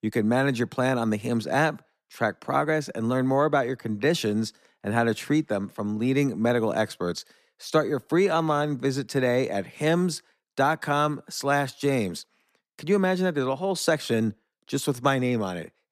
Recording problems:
none

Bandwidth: 14.5 kHz